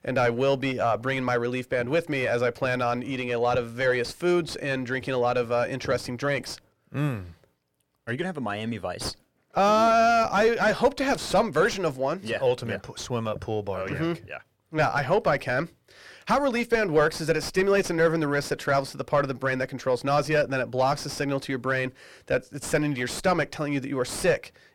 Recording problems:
distortion; heavy; 6 dB below the speech

